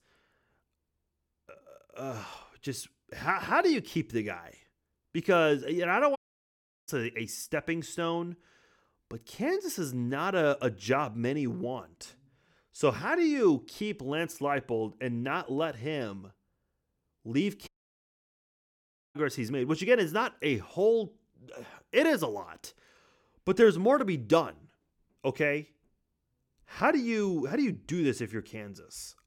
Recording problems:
audio cutting out; at 6 s for 0.5 s and at 18 s for 1.5 s

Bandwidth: 17.5 kHz